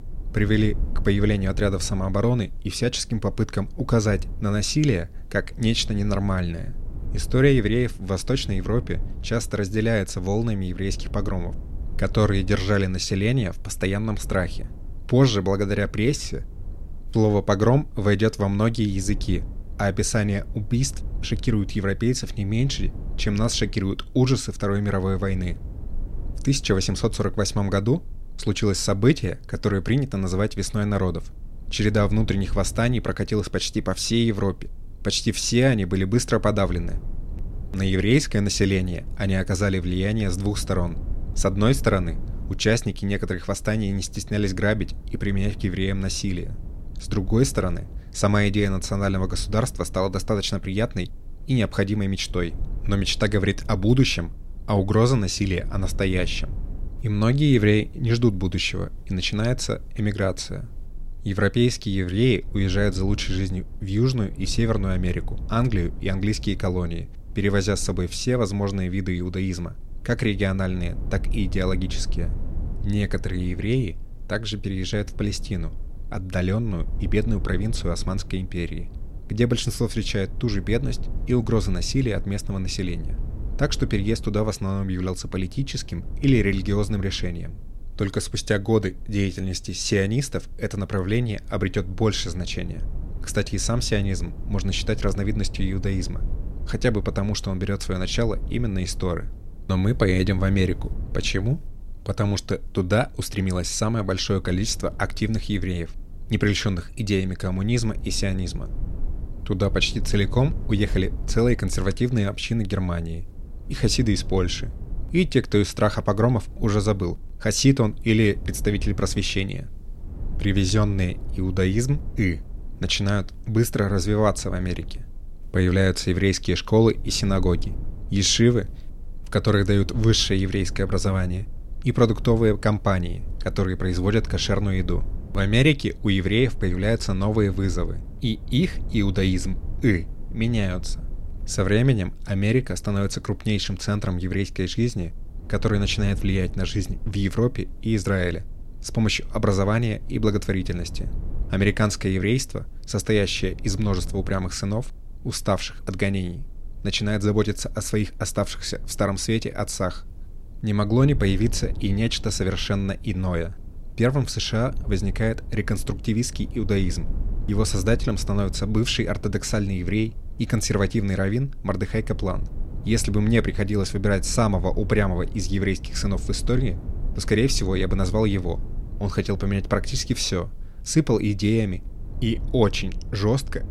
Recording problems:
low rumble; faint; throughout; 25 dB below the speech

